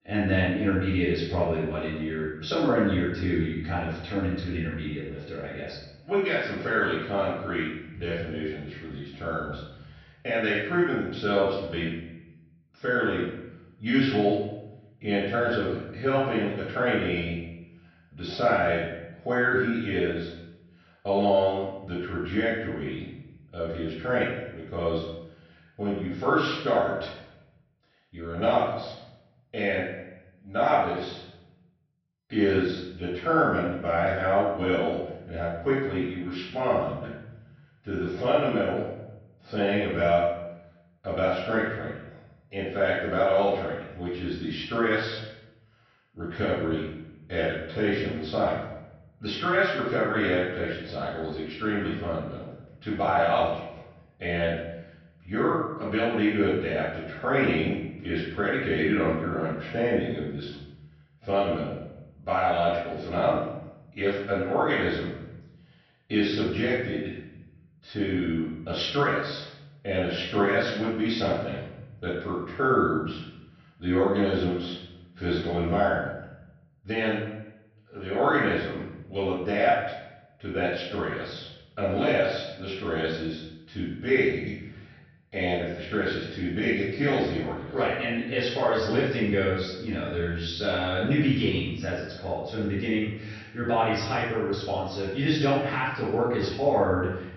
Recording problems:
off-mic speech; far
room echo; noticeable; dies away in 0.8 s
high frequencies cut off; noticeable; nothing above 6 kHz

